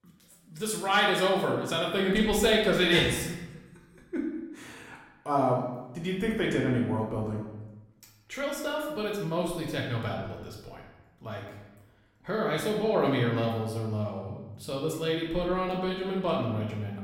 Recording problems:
off-mic speech; far
room echo; noticeable; dies away in 0.9 s

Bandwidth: 16.5 kHz